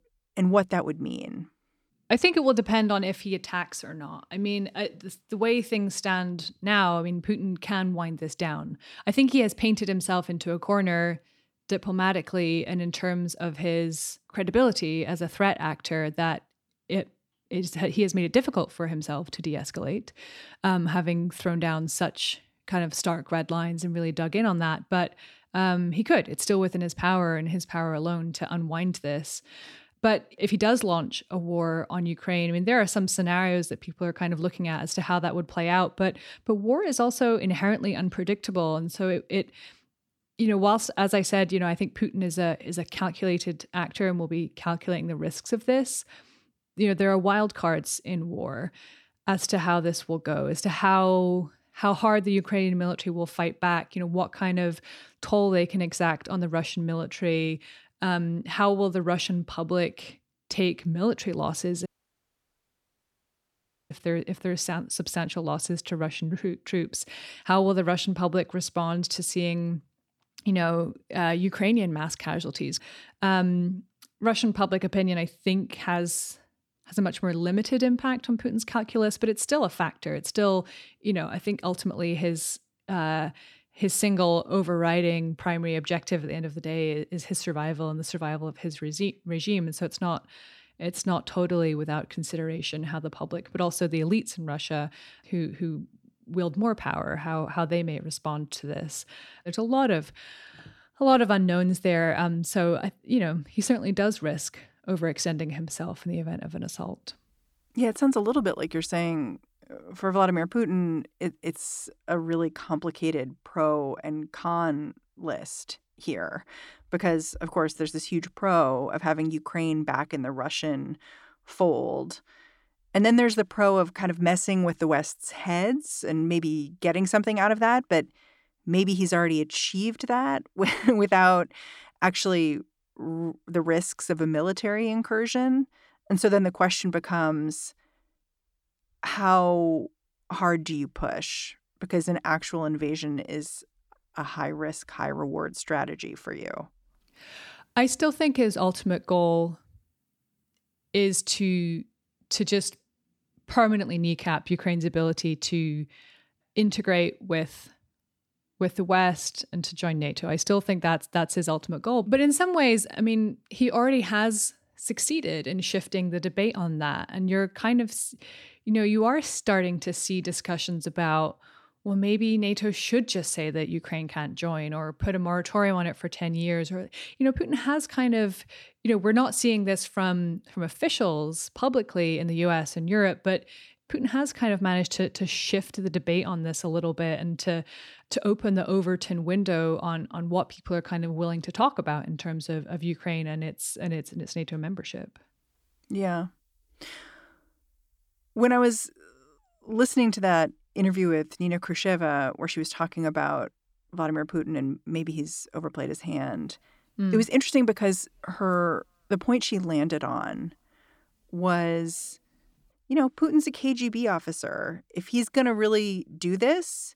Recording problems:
audio cutting out; at 1:02 for 2 s

